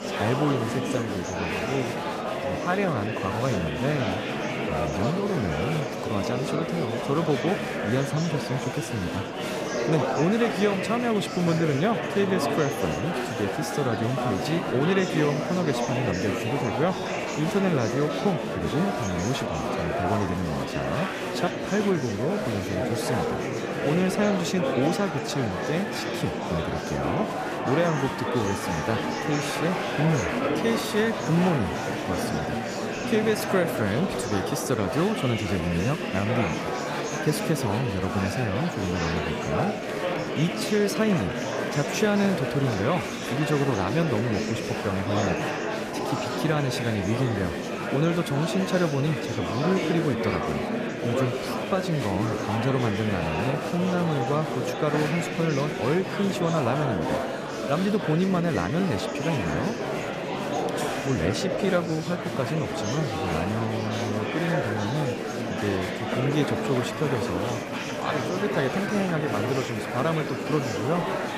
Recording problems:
murmuring crowd; loud; throughout; 1 dB below the speech

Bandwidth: 14.5 kHz